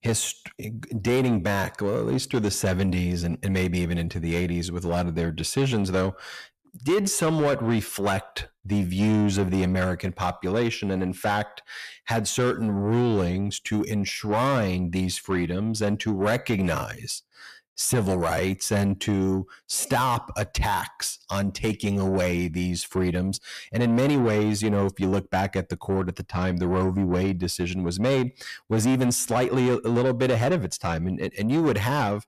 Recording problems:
distortion; slight; 10 dB below the speech

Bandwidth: 14.5 kHz